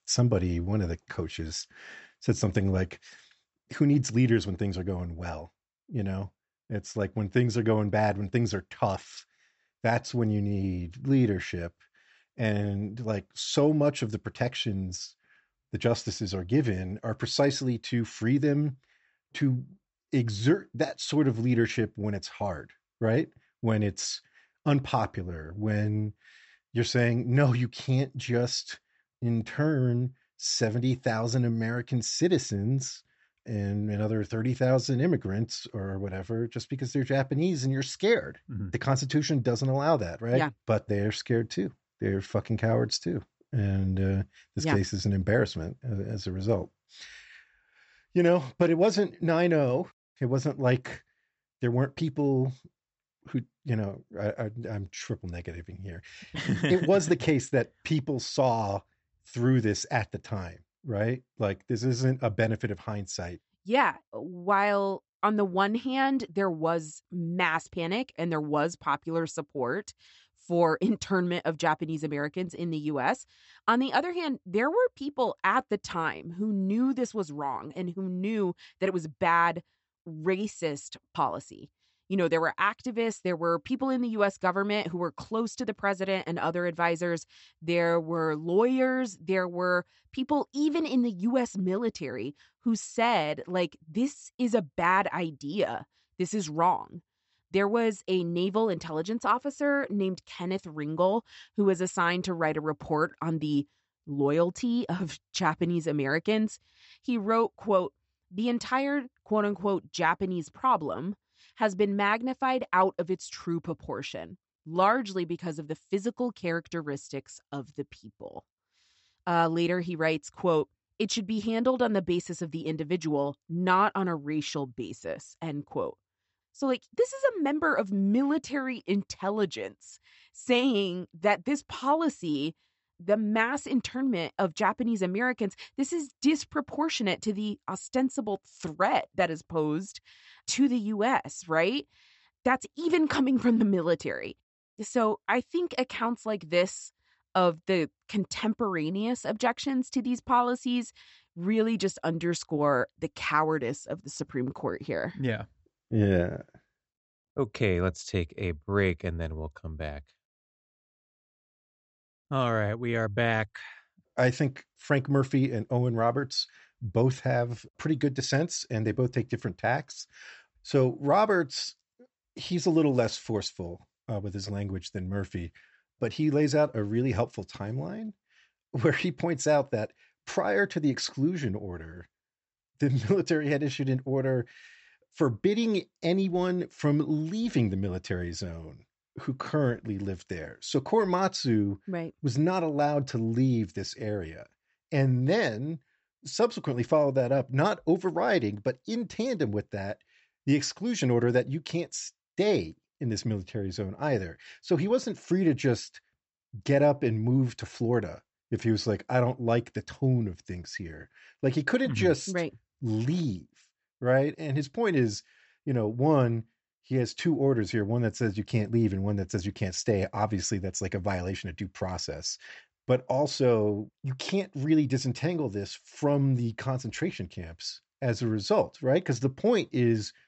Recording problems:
high frequencies cut off; noticeable; nothing above 7.5 kHz

